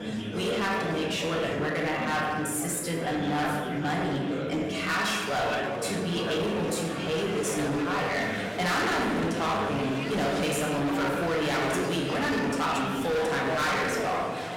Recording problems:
distortion; heavy; 25% of the sound clipped
room echo; noticeable; dies away in 1 s
off-mic speech; somewhat distant
murmuring crowd; loud; throughout; 5 dB below the speech
background music; very faint; throughout; 20 dB below the speech

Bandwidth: 16.5 kHz